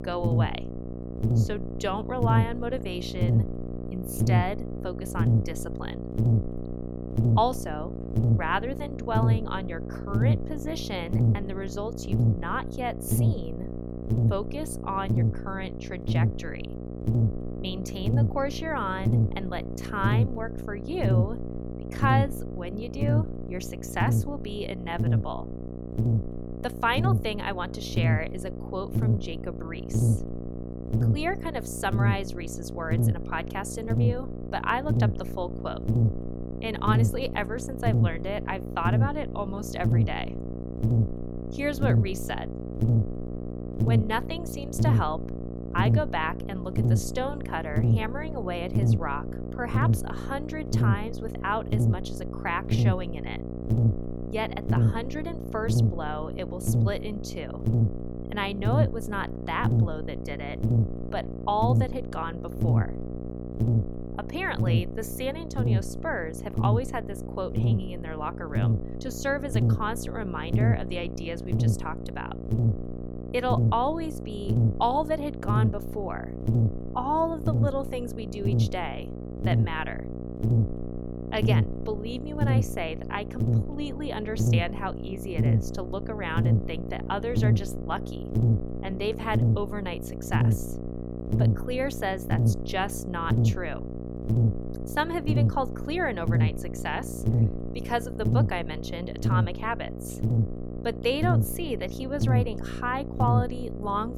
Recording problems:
electrical hum; loud; throughout; 60 Hz, 6 dB below the speech

